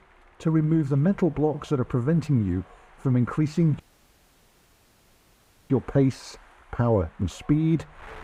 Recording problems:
muffled; slightly; fading above 2 kHz
wind noise on the microphone; occasional gusts; 20 dB below the speech
audio cutting out; at 4 s for 2 s

